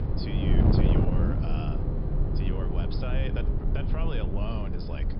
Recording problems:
high frequencies cut off; noticeable; nothing above 5.5 kHz
traffic noise; very loud; throughout; 4 dB above the speech
wind noise on the microphone; heavy; 2 dB above the speech
low rumble; faint; throughout; 20 dB below the speech
voice in the background; very faint; throughout; 30 dB below the speech

